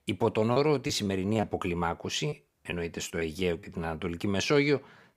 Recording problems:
choppy; very; at 0.5 s and from 2.5 to 3.5 s; 8% of the speech affected

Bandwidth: 15.5 kHz